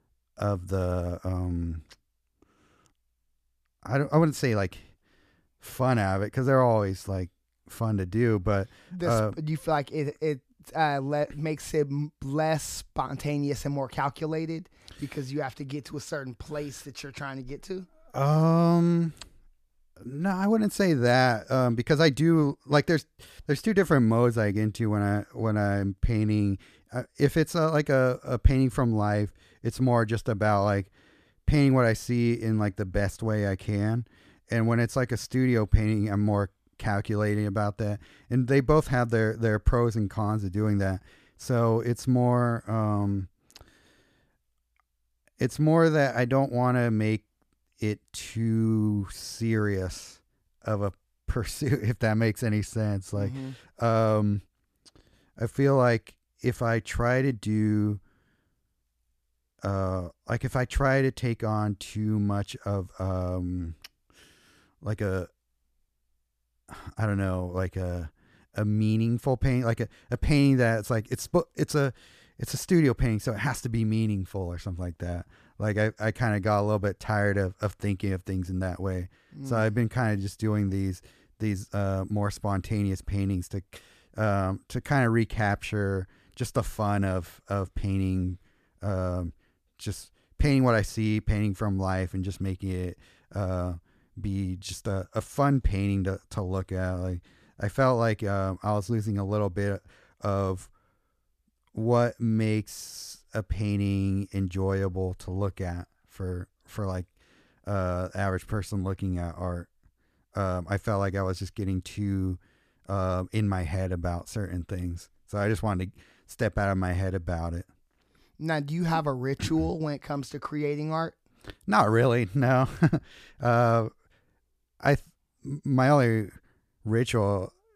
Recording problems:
none

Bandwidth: 14.5 kHz